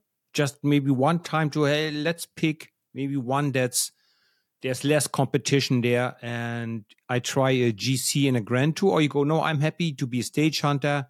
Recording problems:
none

